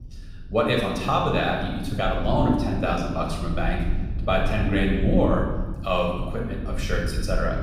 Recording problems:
room echo; noticeable; dies away in 1.1 s
off-mic speech; somewhat distant
low rumble; faint; throughout; 20 dB below the speech

